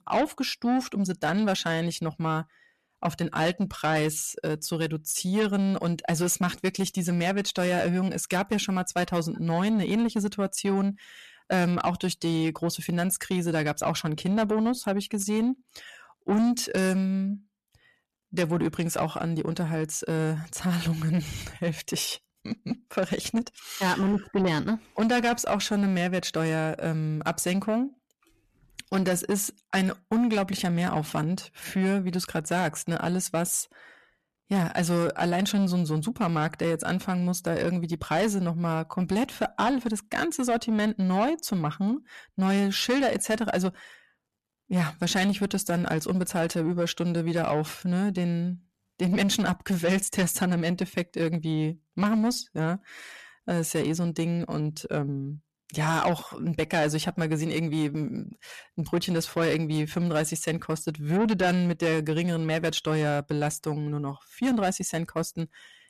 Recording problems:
distortion; slight; 10 dB below the speech

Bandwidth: 13.5 kHz